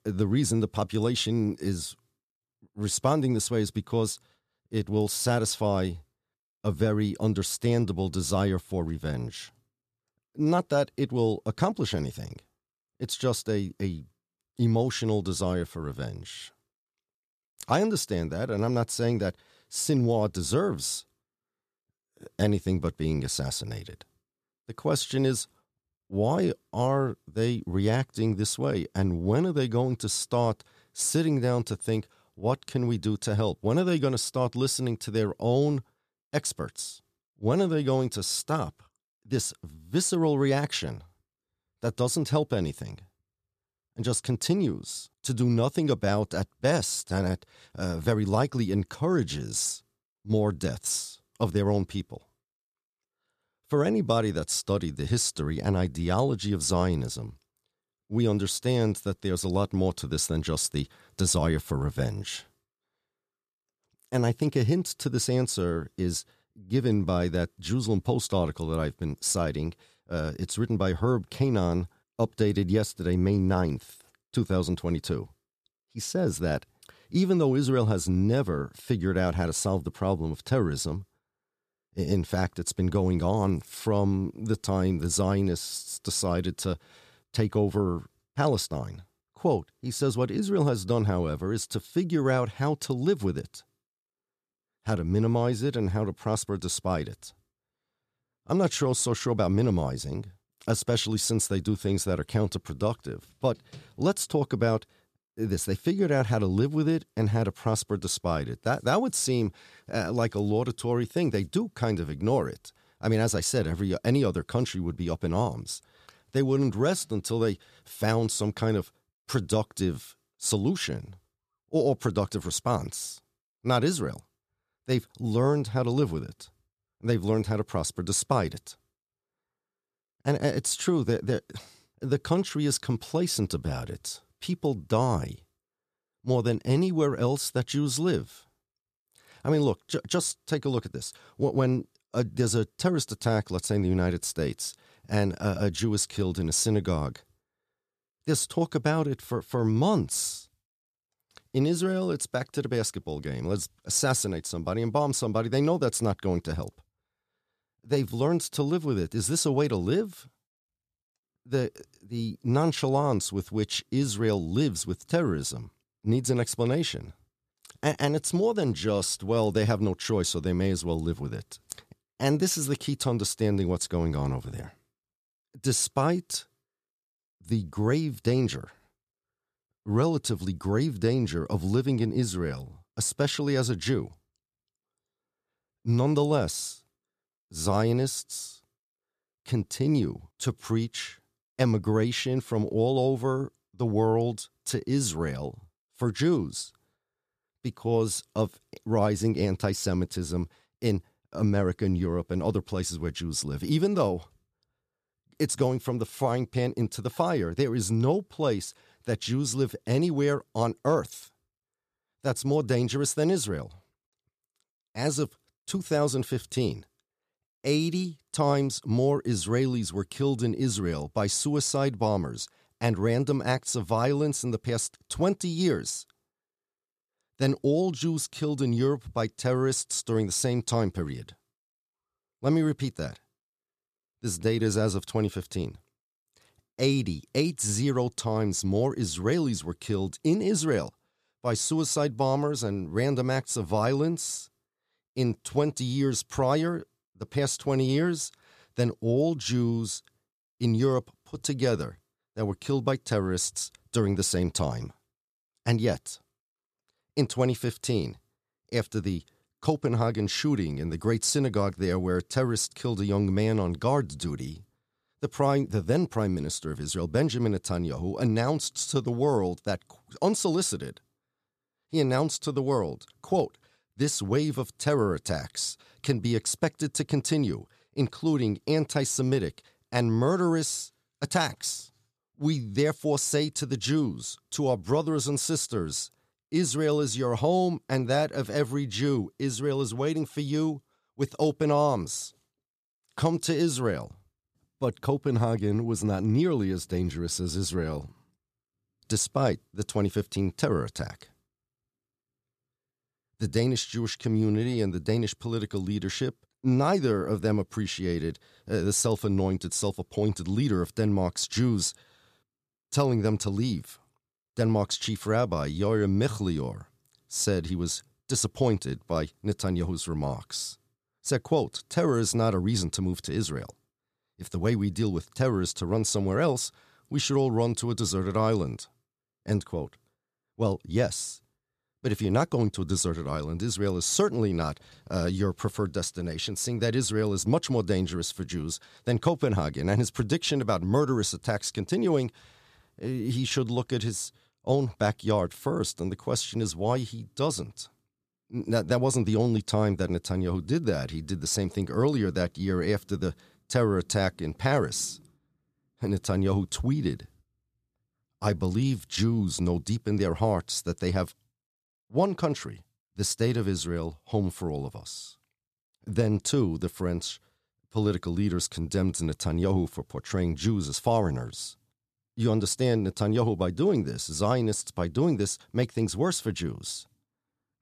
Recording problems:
none

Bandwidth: 14.5 kHz